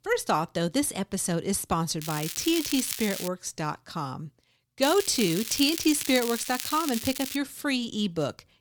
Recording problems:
crackling; loud; from 2 to 3.5 s and from 5 to 7.5 s; 6 dB below the speech

